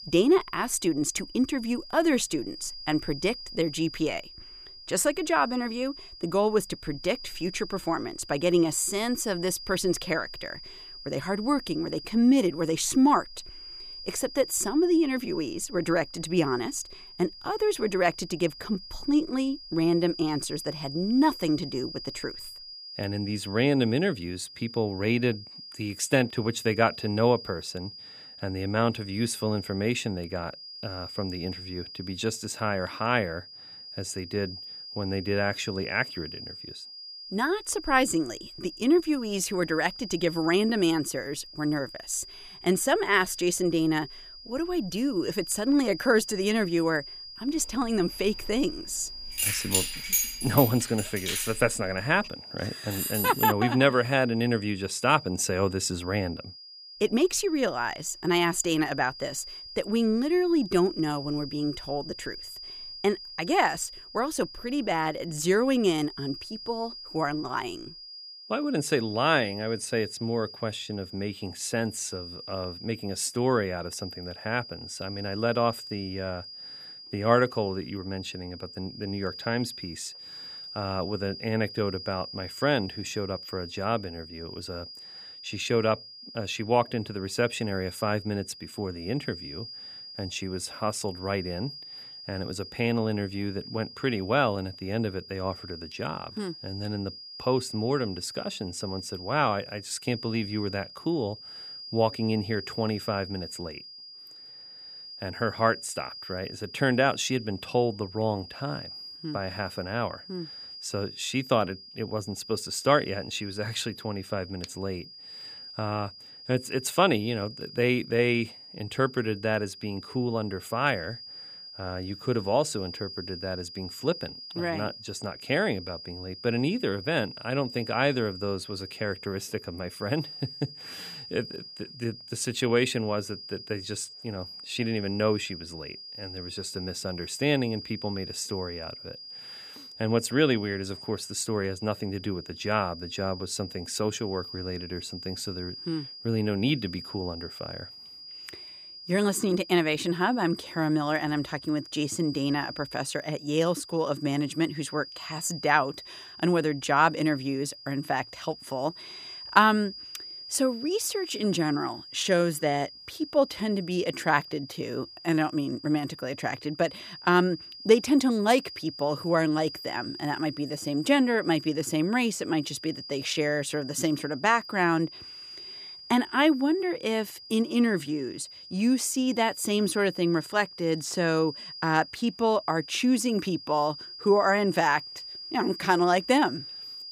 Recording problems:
high-pitched whine; noticeable; throughout; 5 kHz, 15 dB below the speech
jangling keys; loud; from 48 to 52 s; peak 3 dB above the speech
jangling keys; noticeable; at 53 s; peak 1 dB below the speech

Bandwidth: 15 kHz